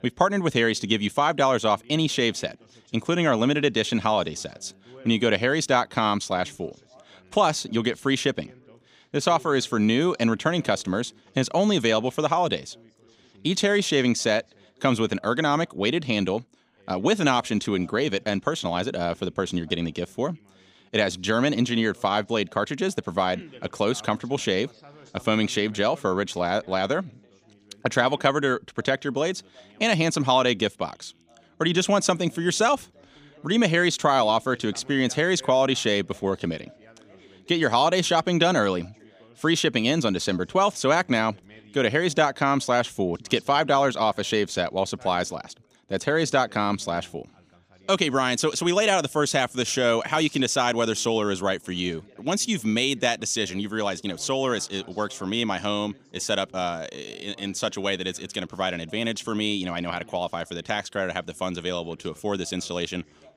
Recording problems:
background chatter; faint; throughout; 2 voices, 30 dB below the speech

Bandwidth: 15 kHz